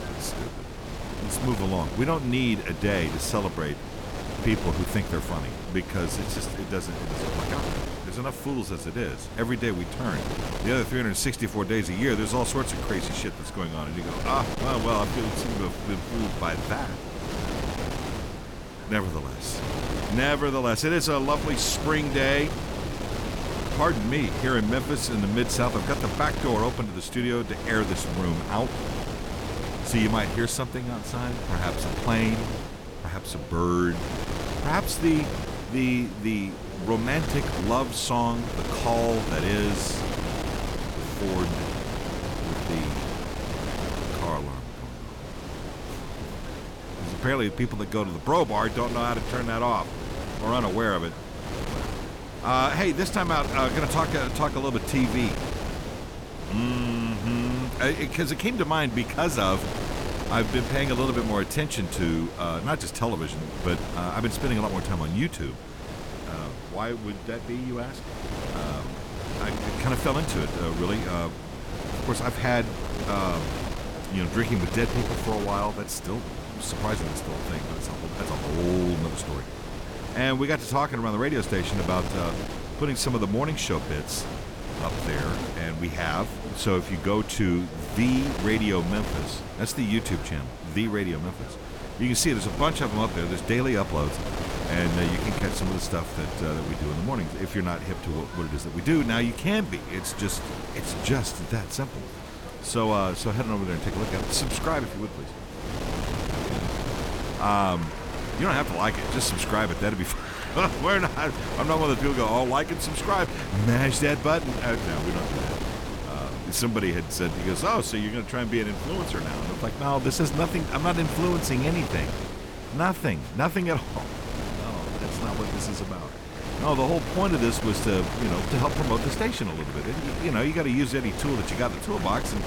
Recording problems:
wind noise on the microphone; heavy; 7 dB below the speech
murmuring crowd; noticeable; throughout; 20 dB below the speech

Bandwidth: 18 kHz